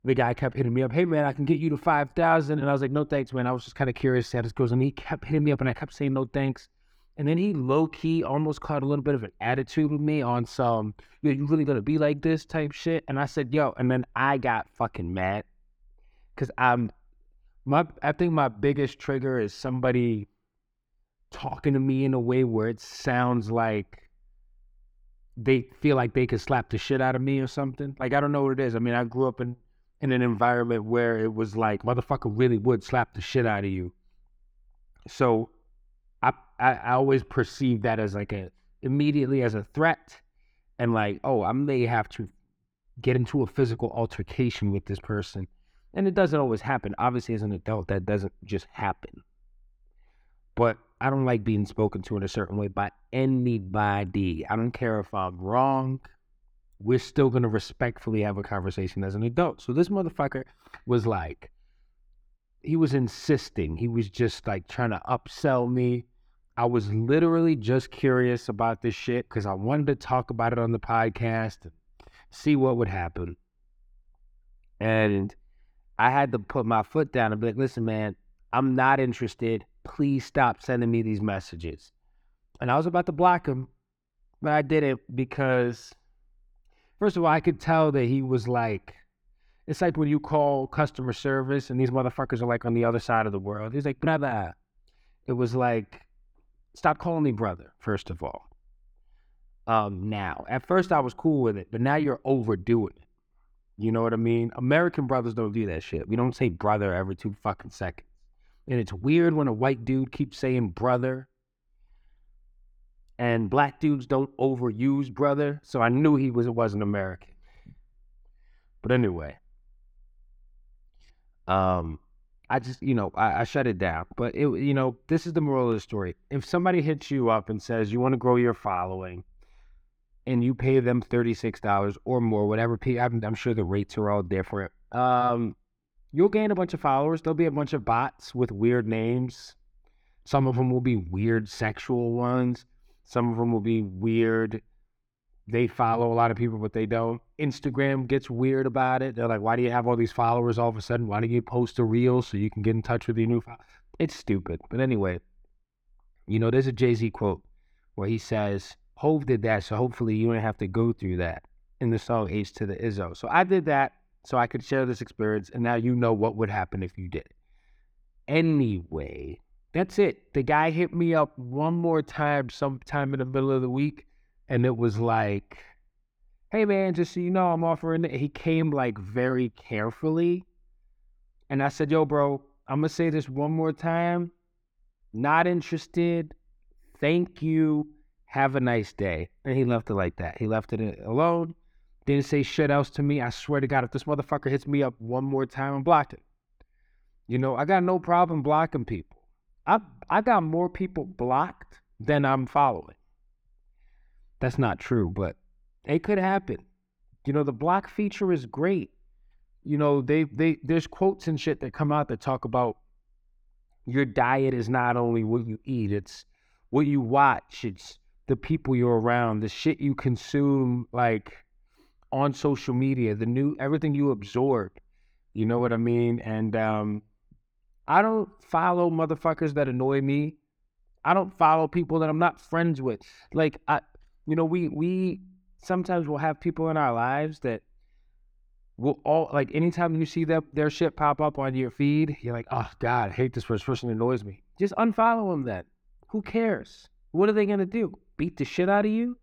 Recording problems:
muffled; slightly; fading above 4 kHz

